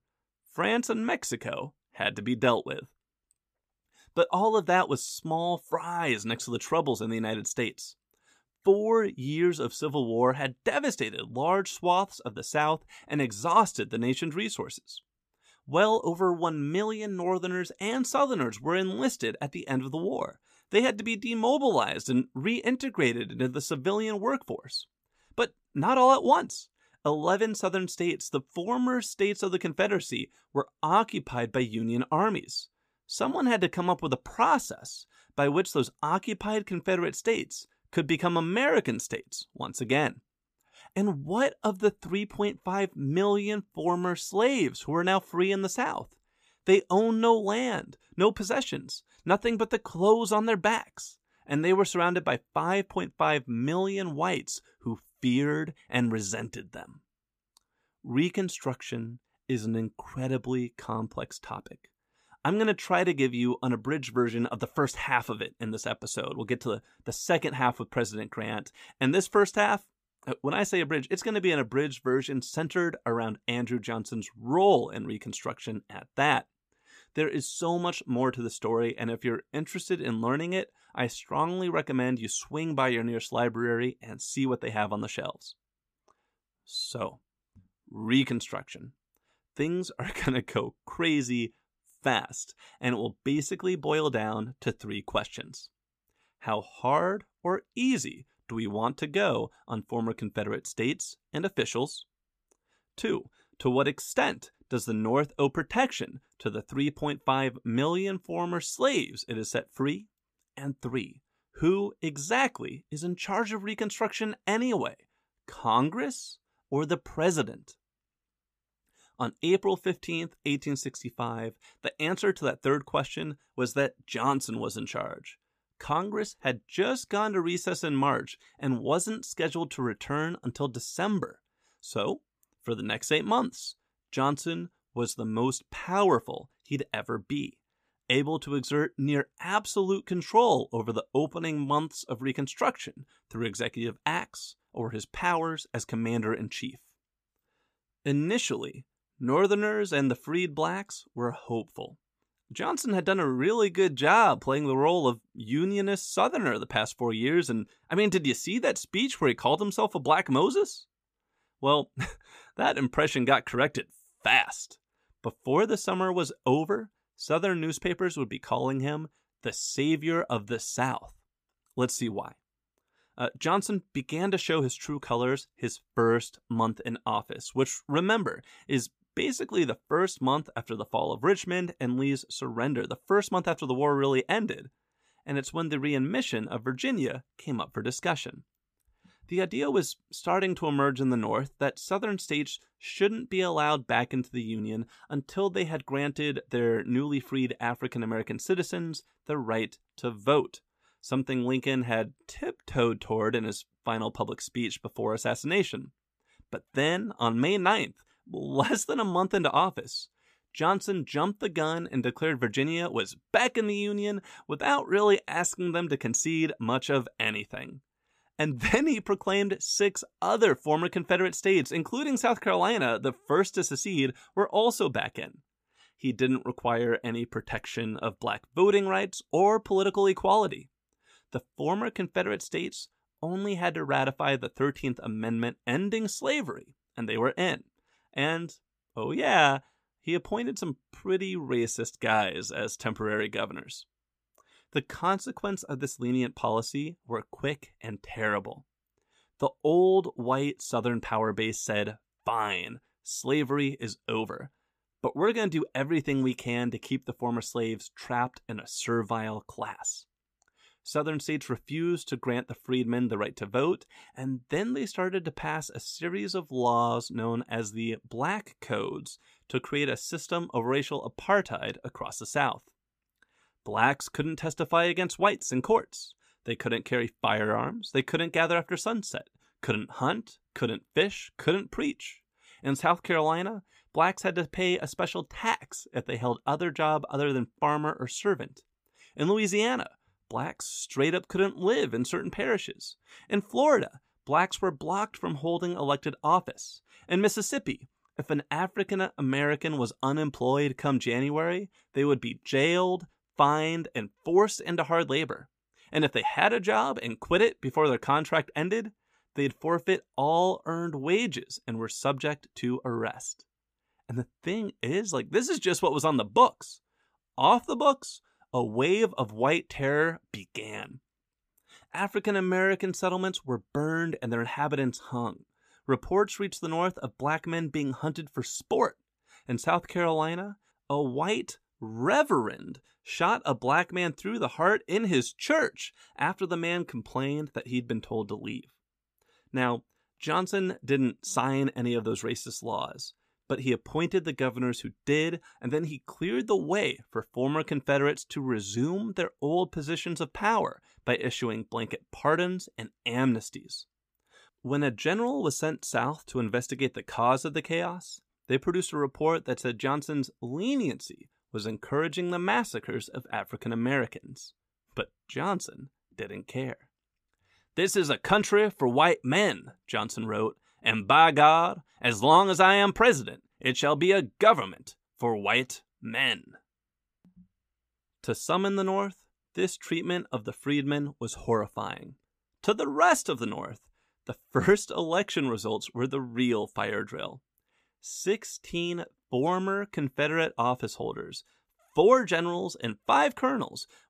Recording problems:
none

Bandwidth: 15 kHz